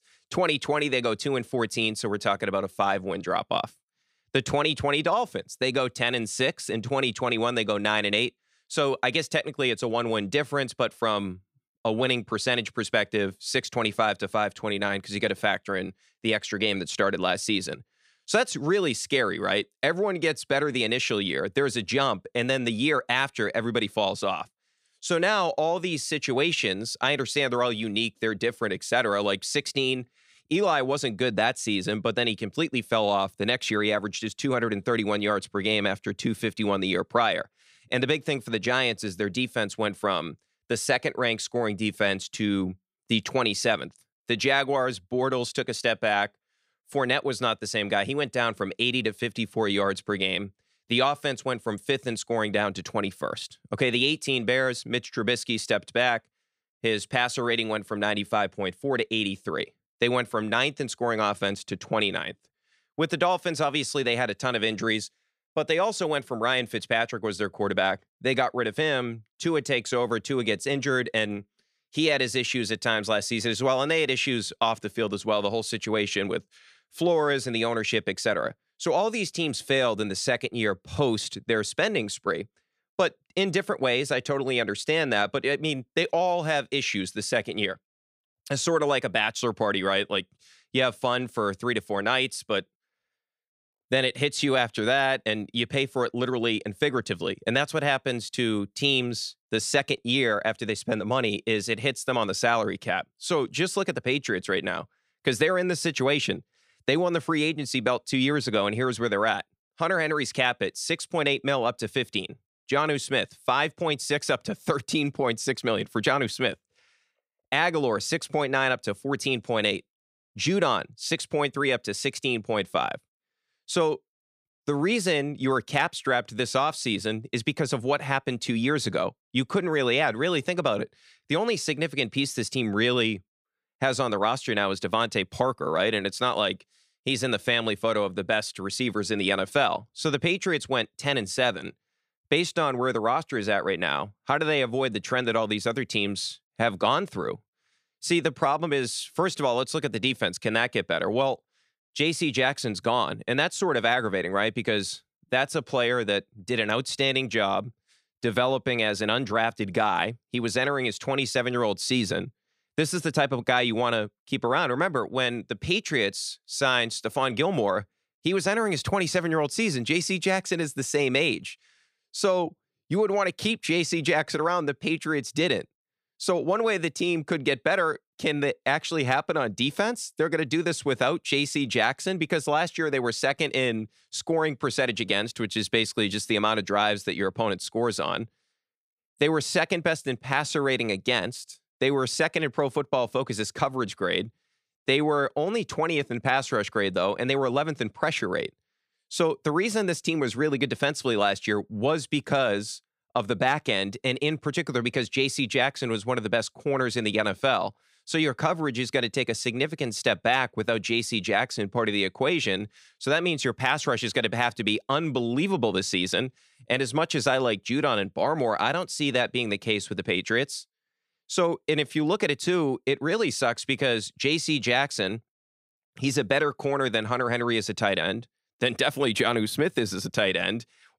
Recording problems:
none

